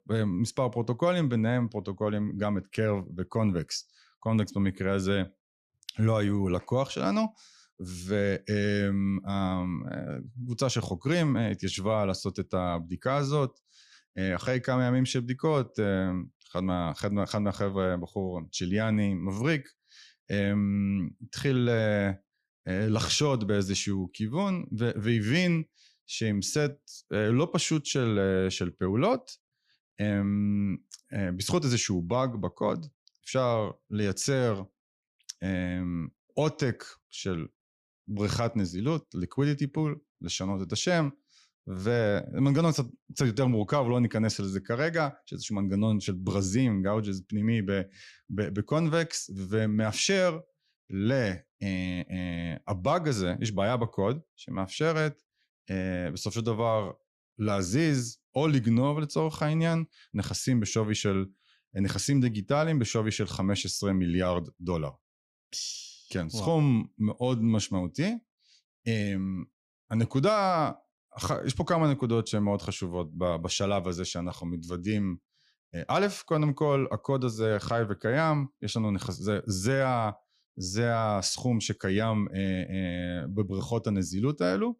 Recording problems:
none

